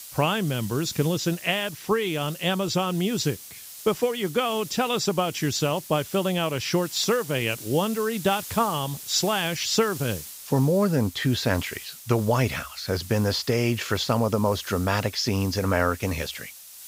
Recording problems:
high frequencies cut off; noticeable; nothing above 8 kHz
hiss; noticeable; throughout; 15 dB below the speech

